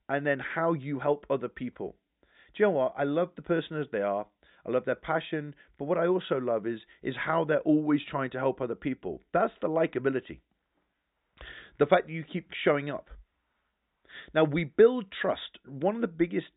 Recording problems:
high frequencies cut off; severe; nothing above 4 kHz

